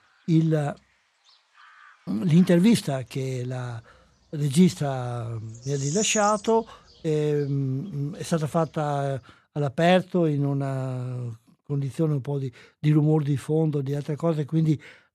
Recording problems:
animal sounds; loud; until 9 s; 8 dB below the speech

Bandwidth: 13.5 kHz